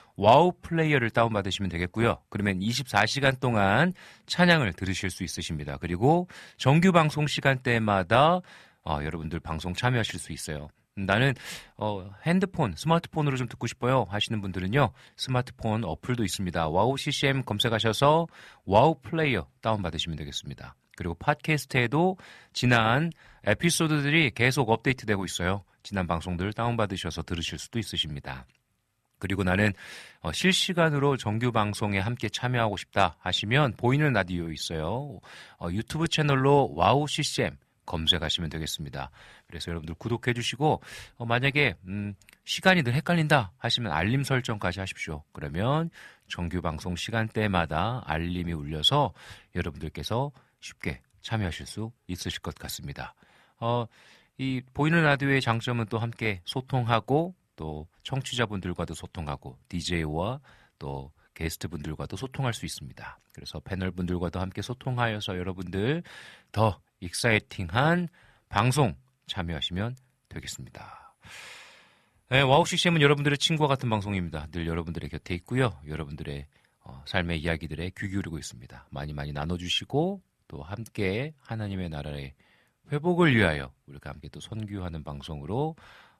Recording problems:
none

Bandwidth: 13.5 kHz